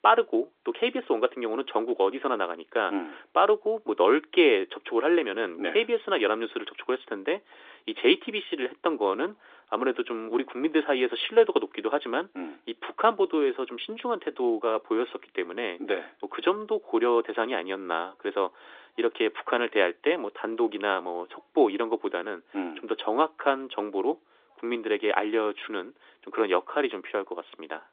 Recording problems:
phone-call audio; nothing above 3.5 kHz

